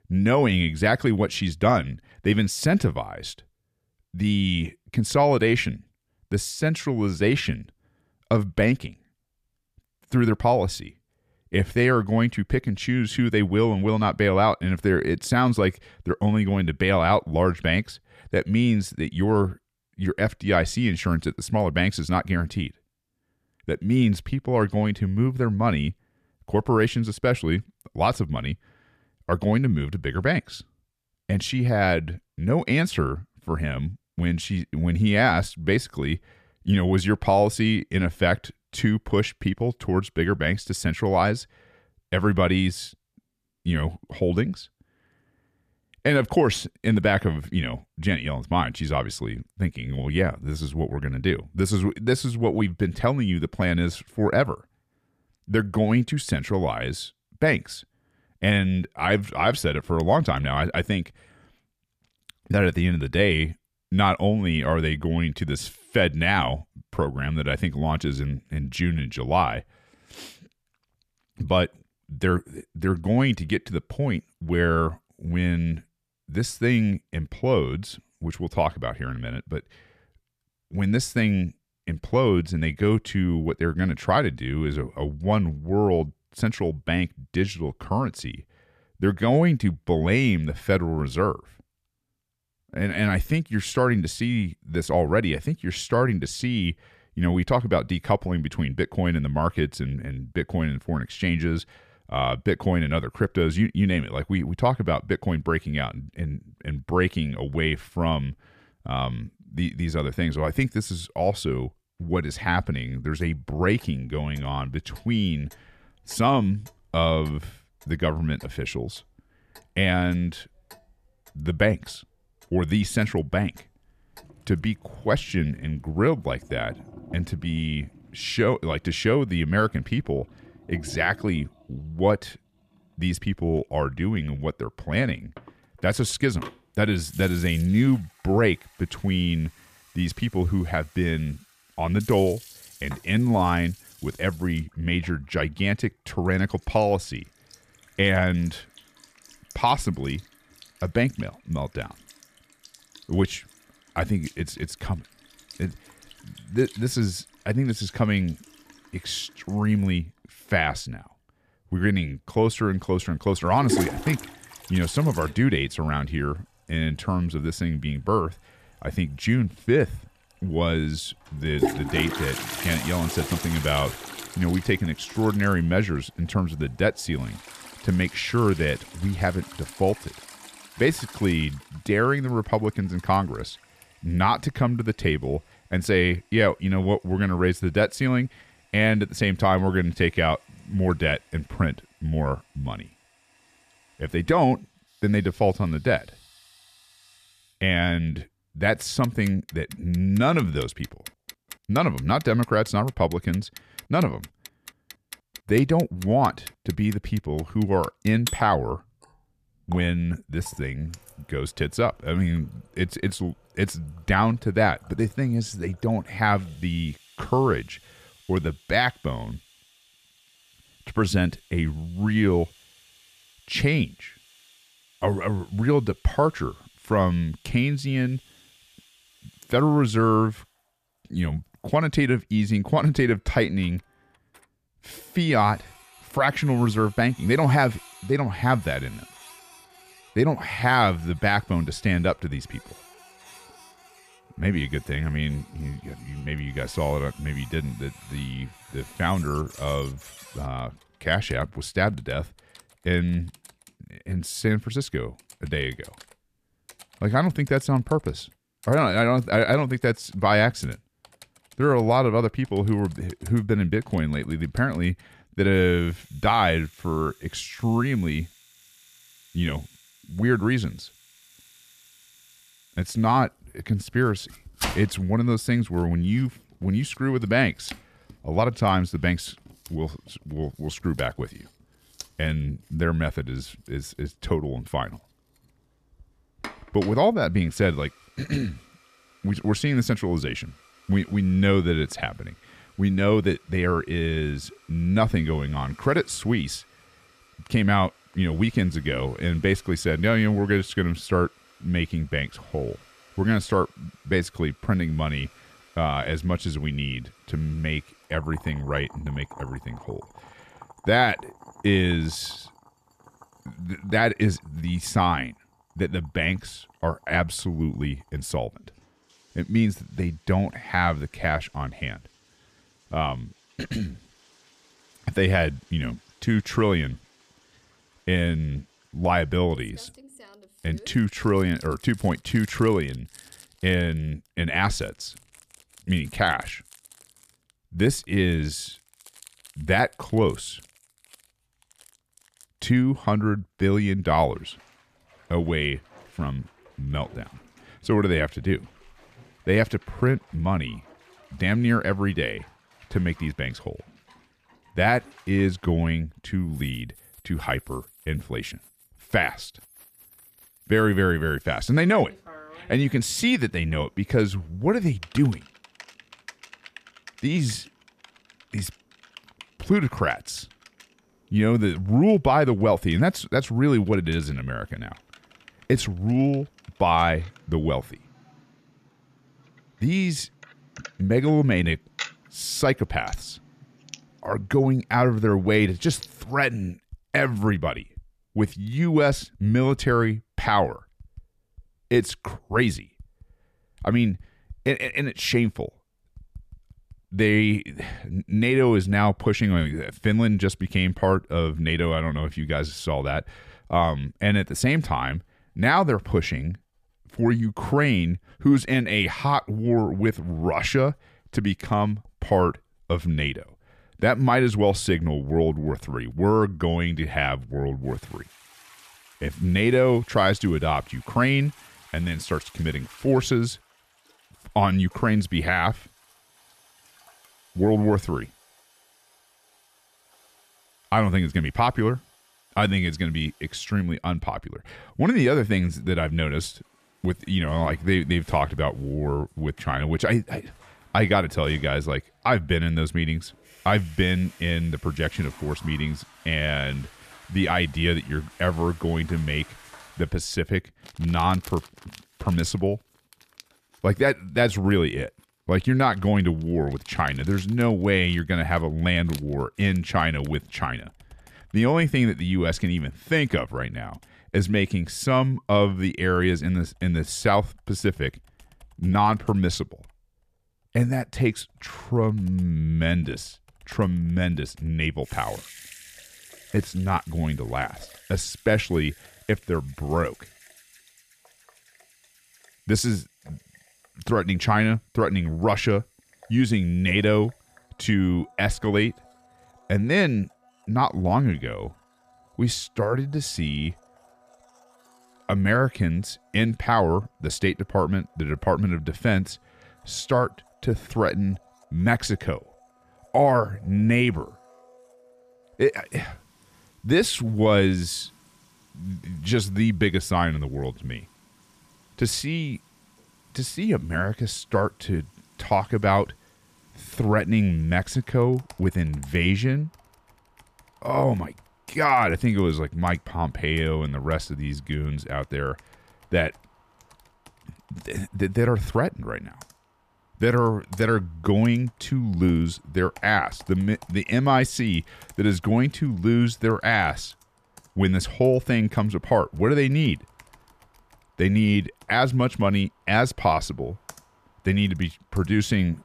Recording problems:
household noises; faint; from 1:53 on; 20 dB below the speech

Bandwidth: 14.5 kHz